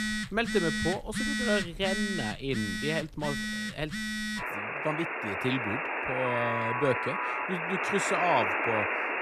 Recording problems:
alarms or sirens; very loud; throughout; 1 dB above the speech

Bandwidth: 14.5 kHz